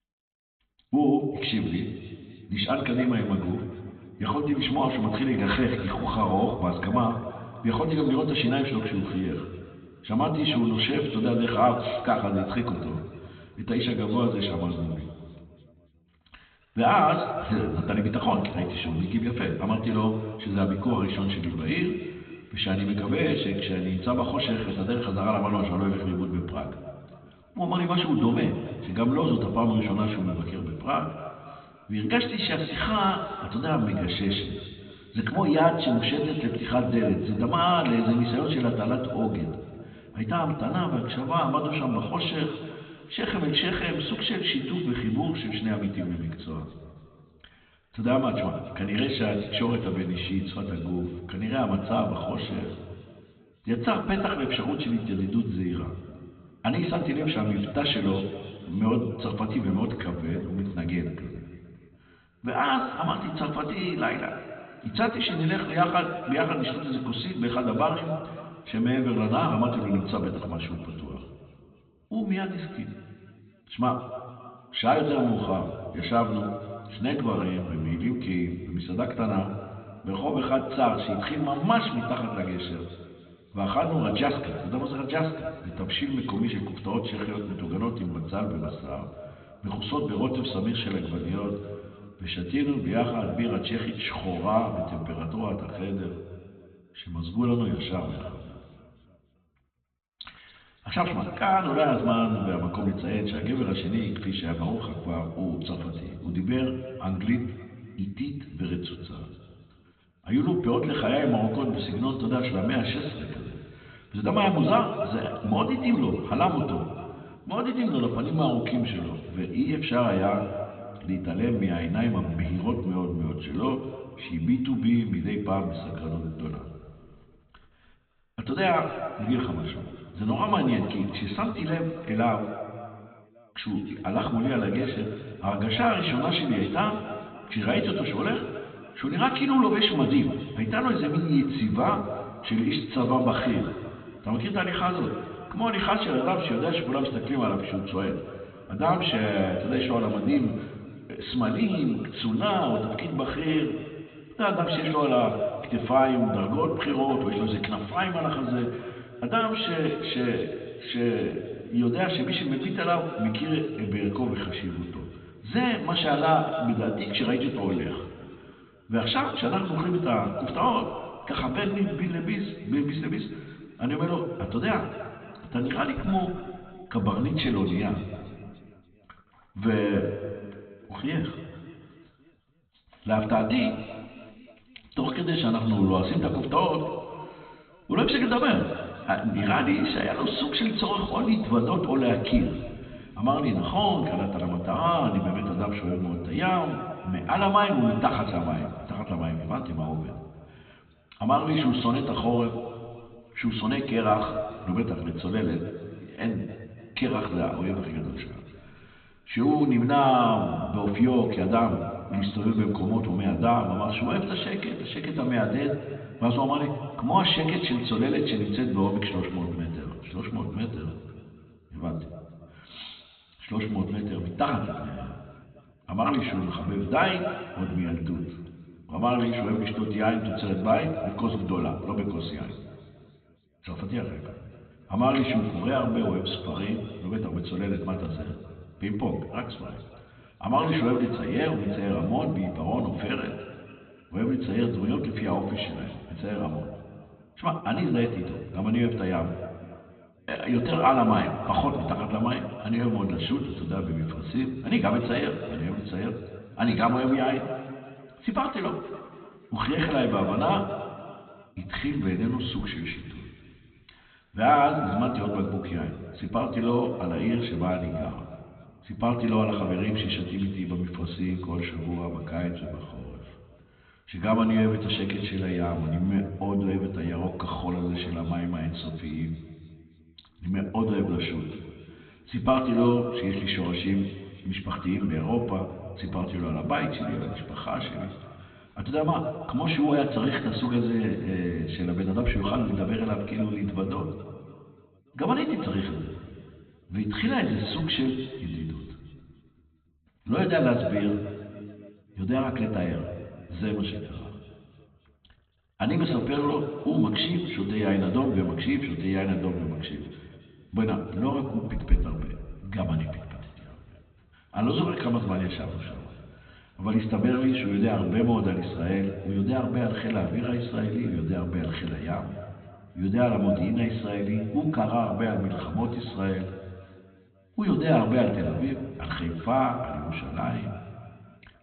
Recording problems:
off-mic speech; far
high frequencies cut off; severe; nothing above 4 kHz
room echo; noticeable; dies away in 1.9 s

